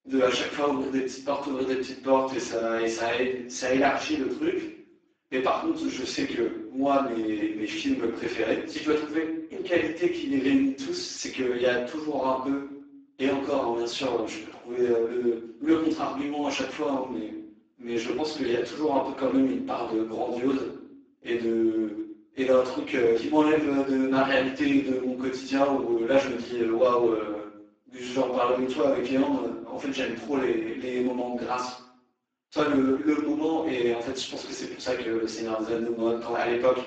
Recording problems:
off-mic speech; far
garbled, watery; badly; nothing above 7.5 kHz
room echo; noticeable; dies away in 0.6 s
thin; very slightly; fading below 300 Hz

